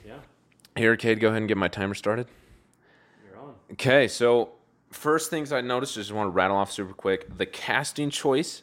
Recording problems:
none

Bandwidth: 16 kHz